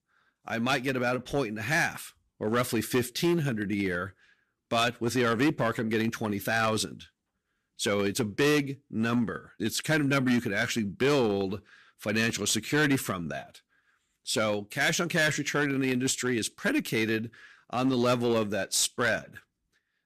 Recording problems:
distortion; slight; 5% of the sound clipped

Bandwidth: 14.5 kHz